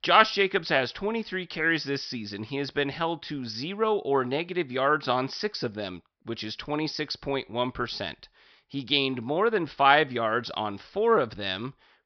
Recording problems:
high frequencies cut off; noticeable; nothing above 5.5 kHz

